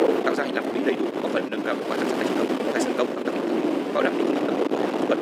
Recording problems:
wrong speed, natural pitch; too fast; 1.8 times normal speed
thin; somewhat; fading below 300 Hz
wind noise on the microphone; heavy; 2 dB above the speech
uneven, jittery; strongly; from 0.5 to 4.5 s

